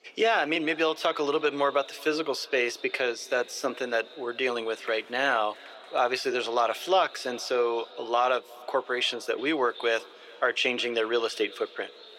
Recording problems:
thin; somewhat; fading below 400 Hz
echo of what is said; faint; throughout; 360 ms later, 20 dB below the speech
murmuring crowd; faint; throughout; 25 dB below the speech

